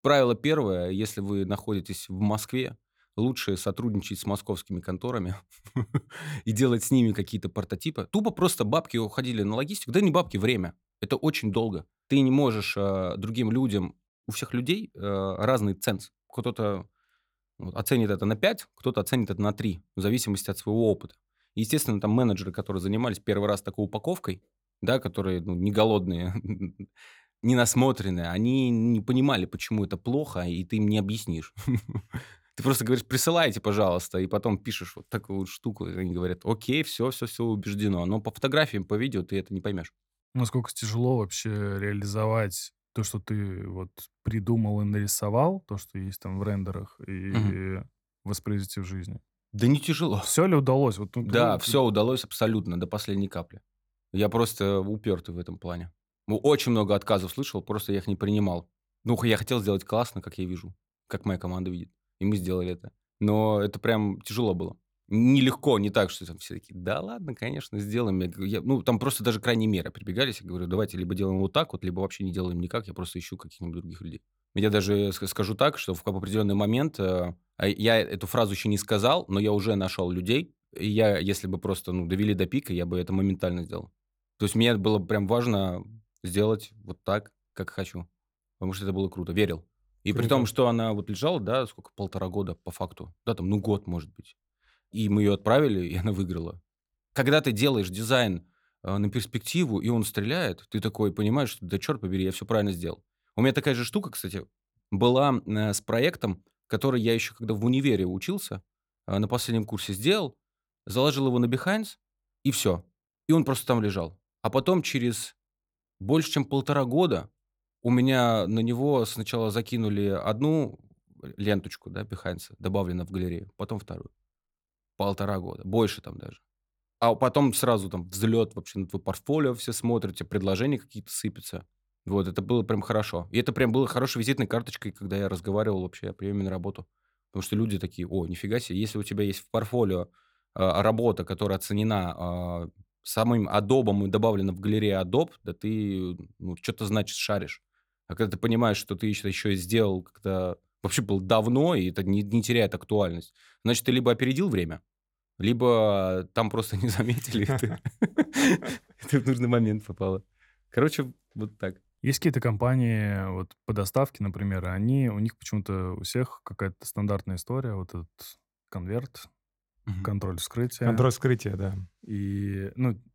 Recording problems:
none

